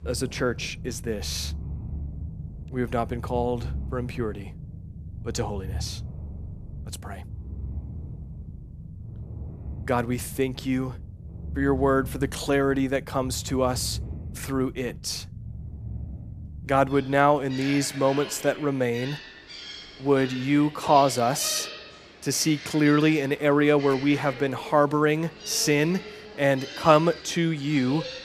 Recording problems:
animal sounds; noticeable; throughout; 15 dB below the speech

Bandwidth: 14.5 kHz